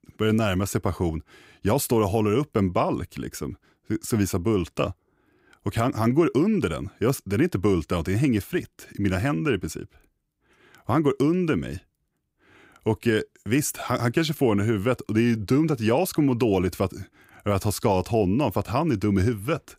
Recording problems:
none

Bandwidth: 15.5 kHz